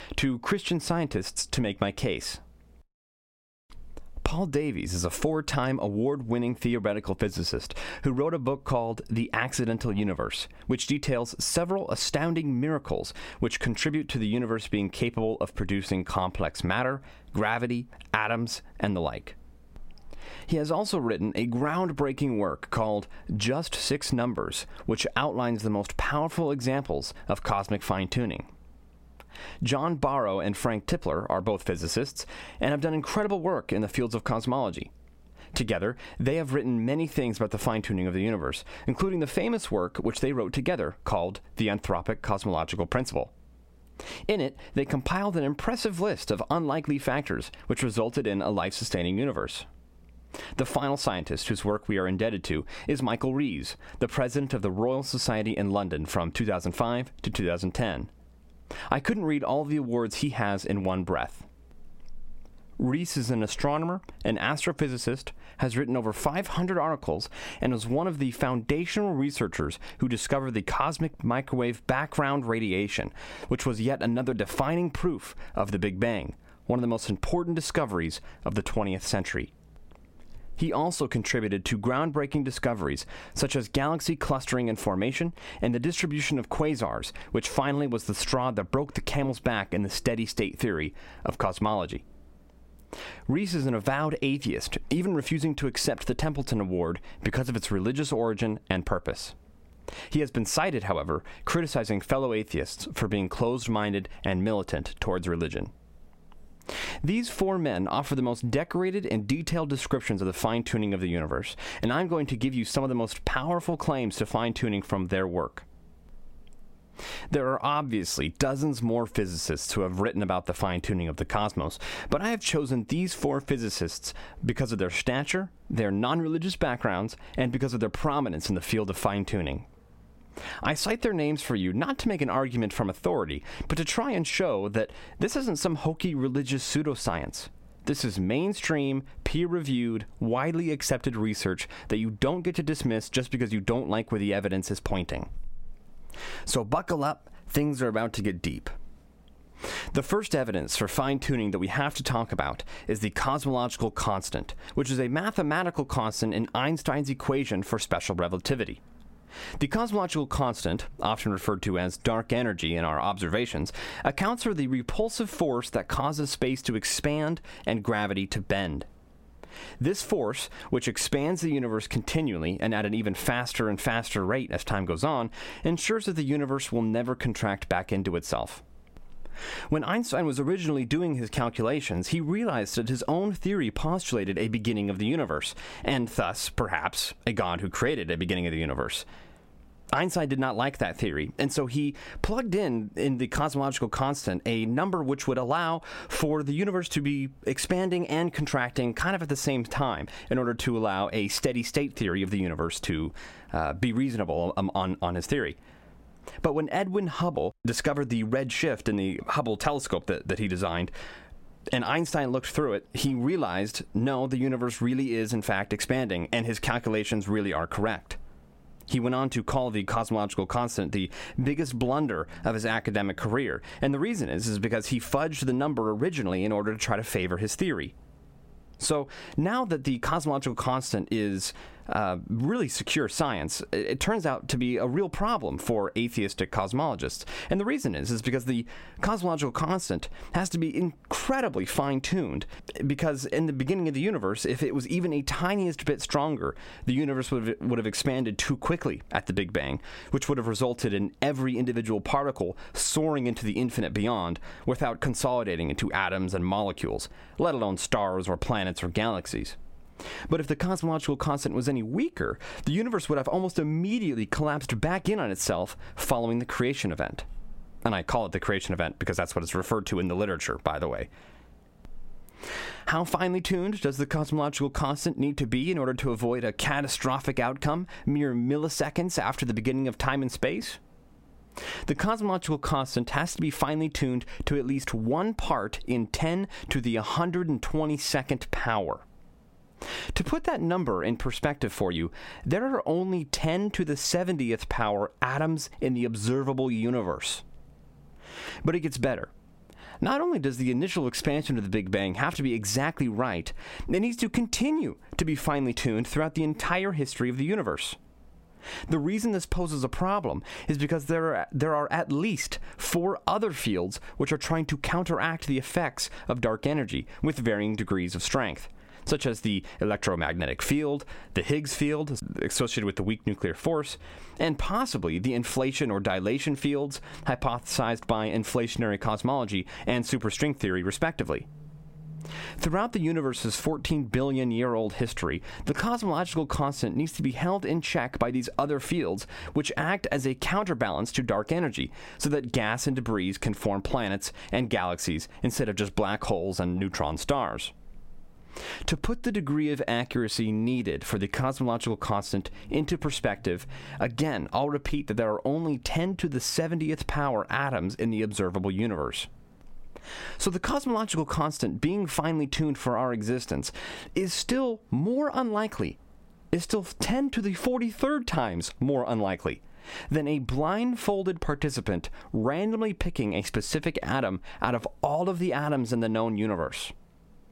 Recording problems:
squashed, flat; somewhat

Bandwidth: 16 kHz